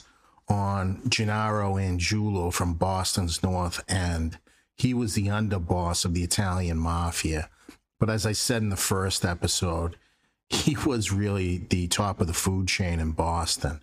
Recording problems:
squashed, flat; somewhat

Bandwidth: 15 kHz